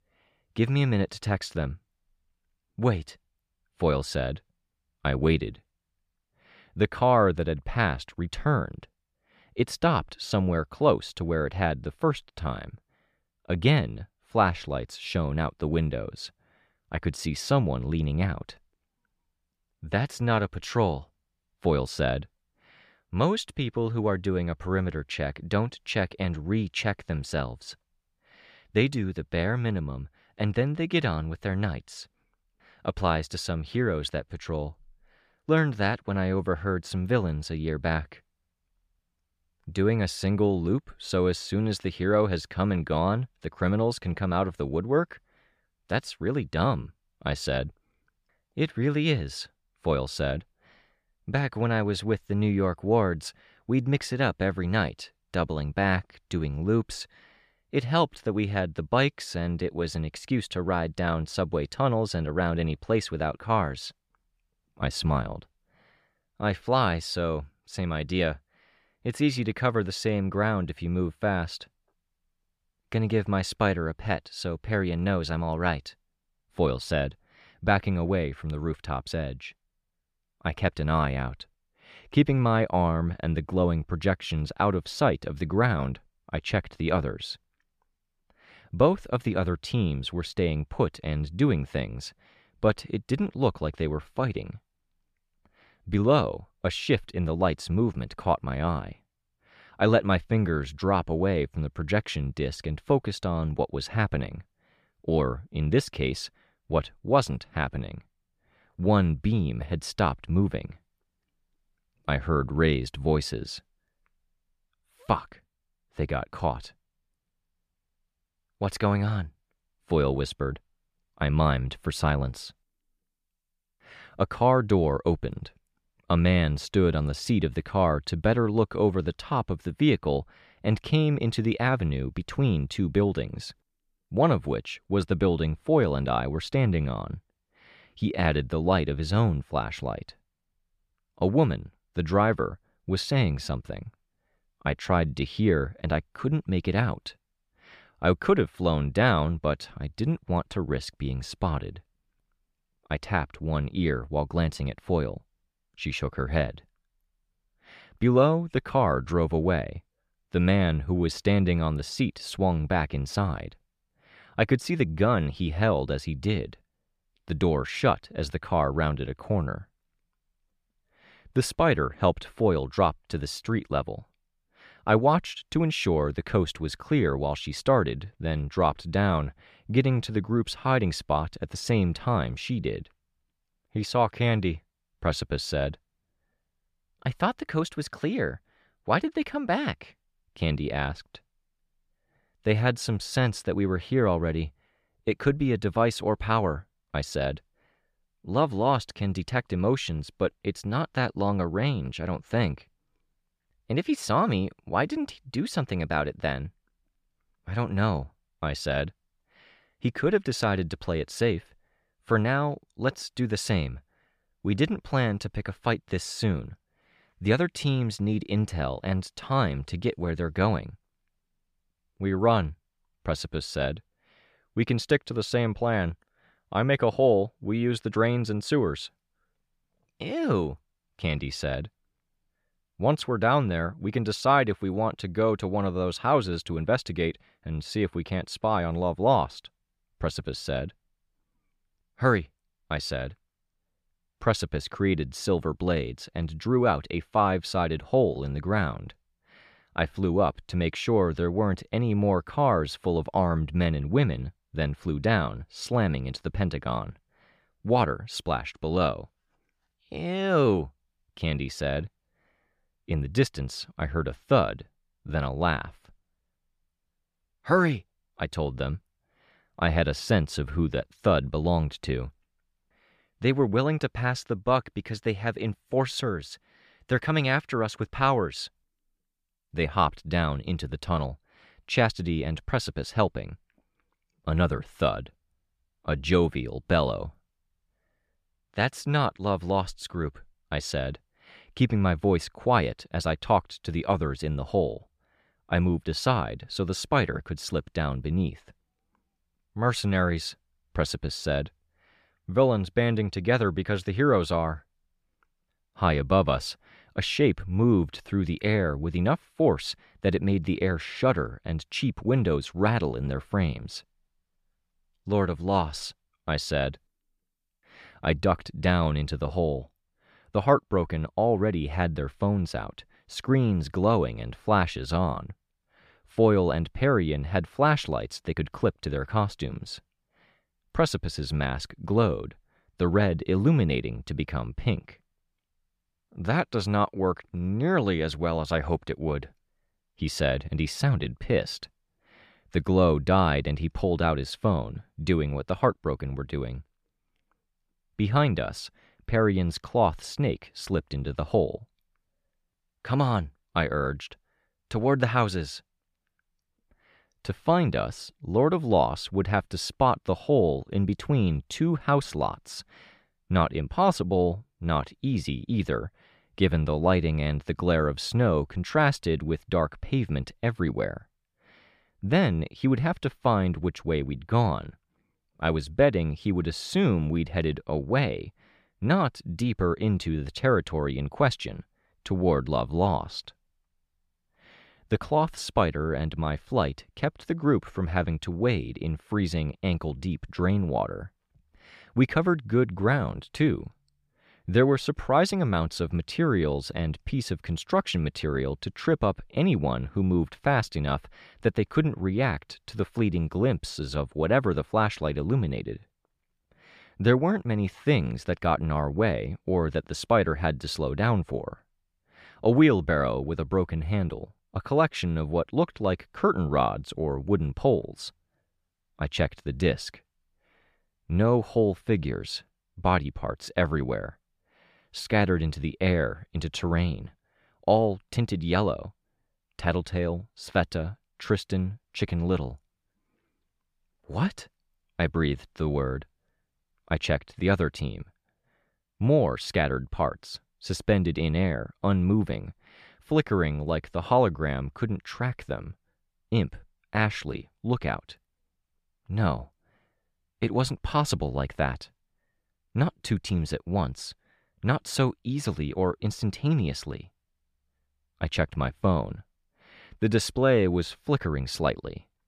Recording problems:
none

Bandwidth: 14.5 kHz